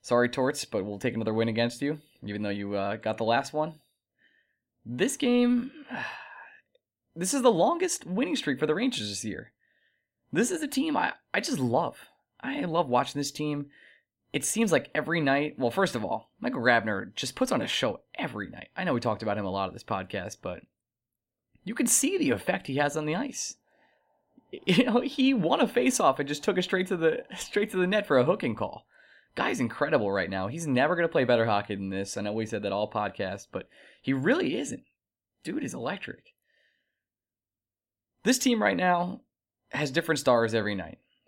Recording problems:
none

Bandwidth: 16.5 kHz